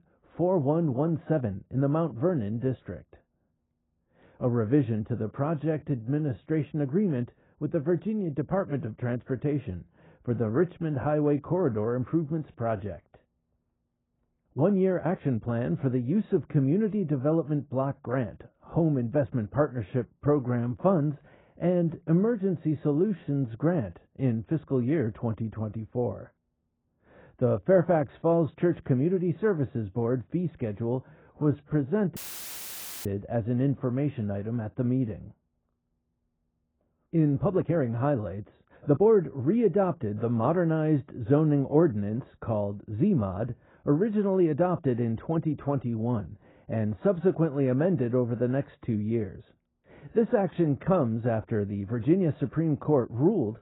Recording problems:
garbled, watery; badly; nothing above 16 kHz
muffled; very; fading above 2 kHz
uneven, jittery; strongly; from 5.5 to 39 s
audio cutting out; filled with static; at 32 s for 1 s

